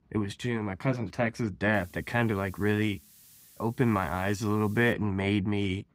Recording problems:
hiss; faint; from 1.5 to 5 s; 25 dB below the speech

